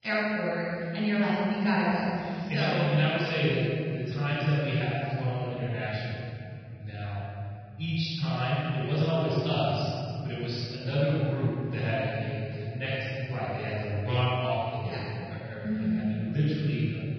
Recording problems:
room echo; strong; dies away in 3 s
off-mic speech; far
garbled, watery; badly; nothing above 5.5 kHz

